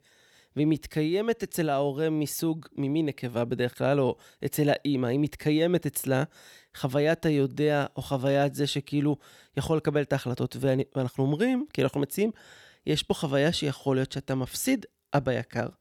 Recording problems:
none

